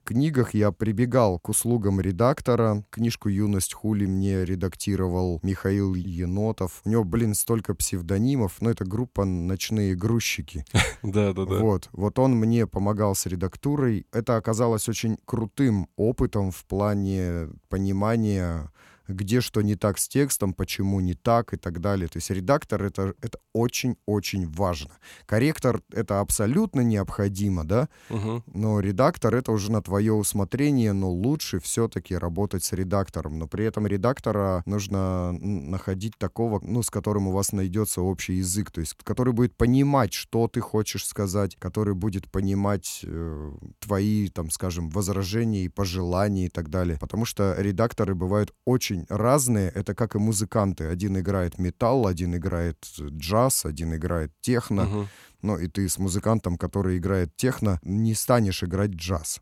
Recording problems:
none

